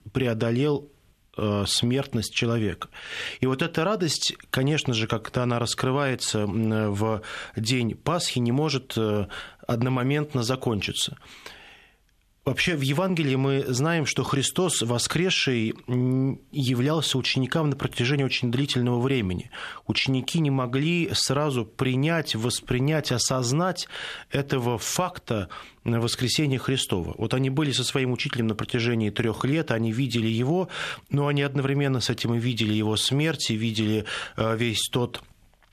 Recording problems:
squashed, flat; somewhat

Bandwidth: 14 kHz